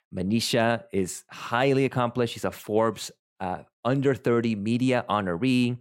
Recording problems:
none

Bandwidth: 16 kHz